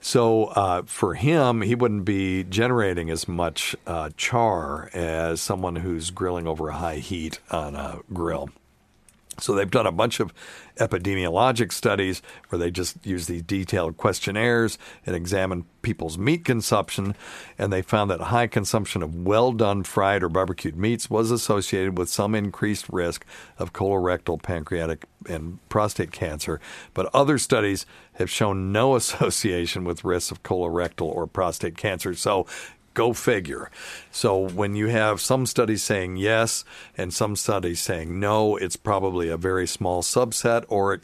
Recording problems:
none

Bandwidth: 14 kHz